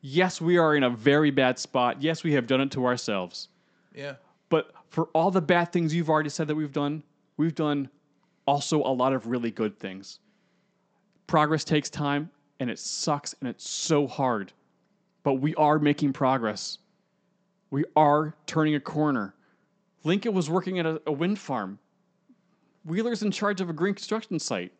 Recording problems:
high frequencies cut off; noticeable; nothing above 8 kHz

